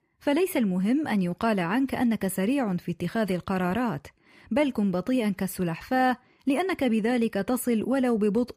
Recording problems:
none

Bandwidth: 15 kHz